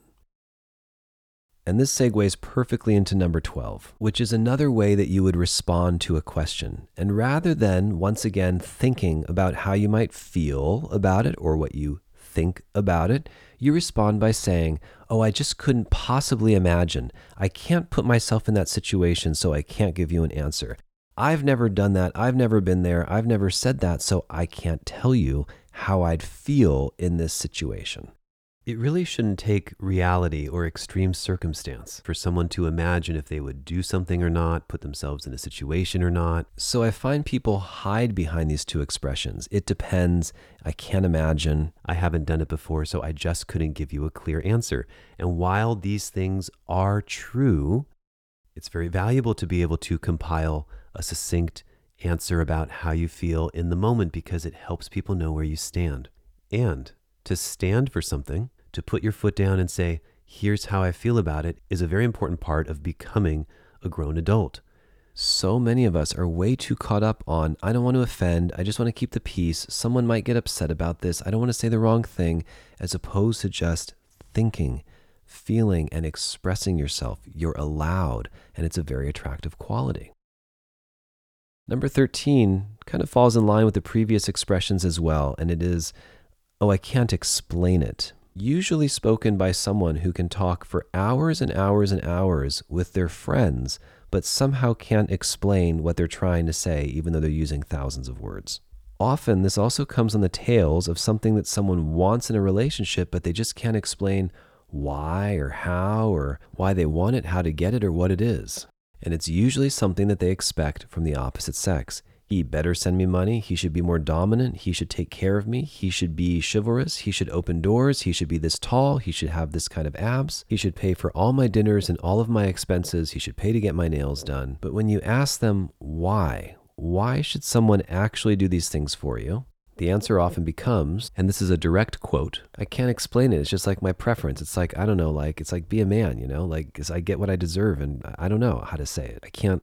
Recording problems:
none

